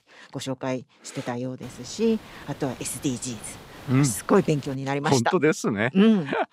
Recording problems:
hiss; faint; from 1.5 to 5 s; 20 dB below the speech

